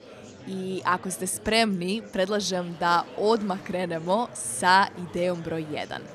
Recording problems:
murmuring crowd; noticeable; throughout; 20 dB below the speech

